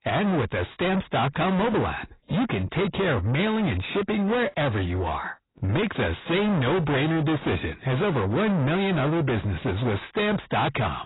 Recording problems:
distortion; heavy; 5 dB below the speech
garbled, watery; badly; nothing above 4 kHz

